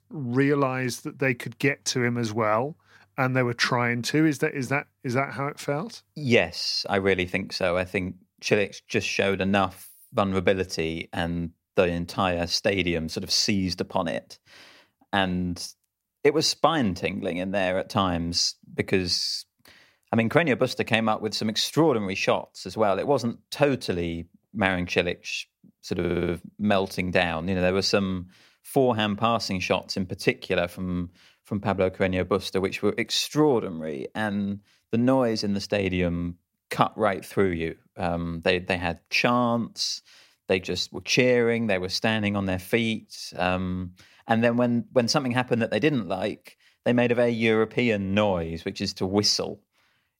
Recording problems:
audio stuttering; at 26 s

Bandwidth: 16 kHz